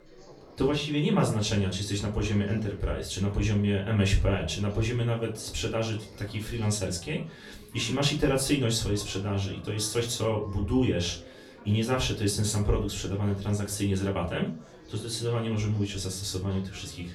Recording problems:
off-mic speech; far
room echo; very slight; dies away in 0.3 s
chatter from many people; faint; throughout; 20 dB below the speech

